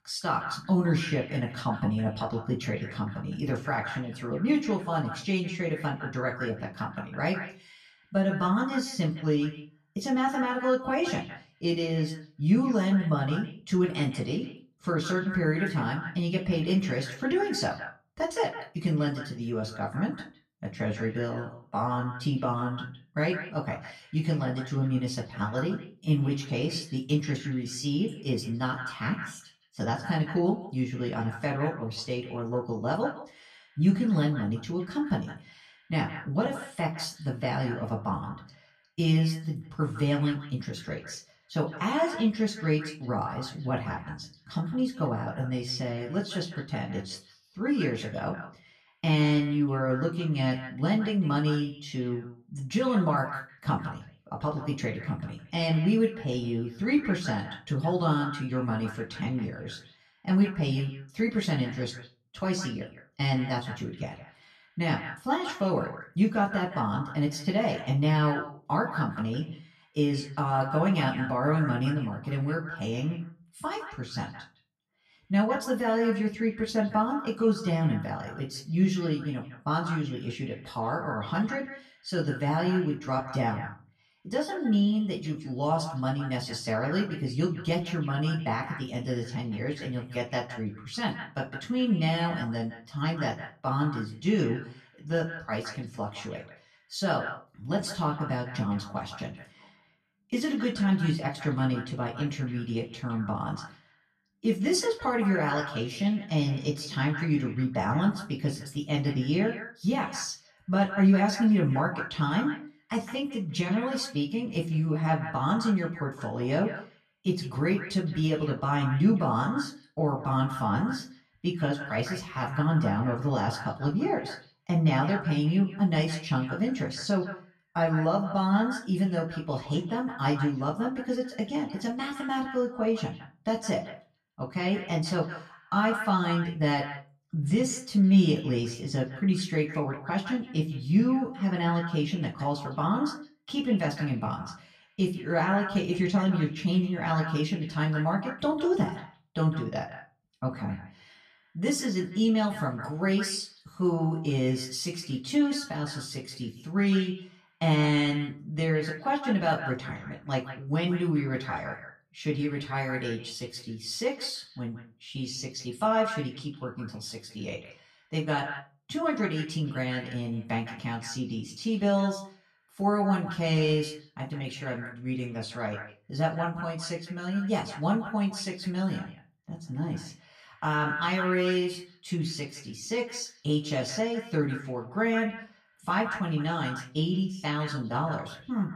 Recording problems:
off-mic speech; far
echo of what is said; noticeable; throughout; 160 ms later, 15 dB below the speech
room echo; very slight; dies away in 0.3 s

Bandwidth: 13.5 kHz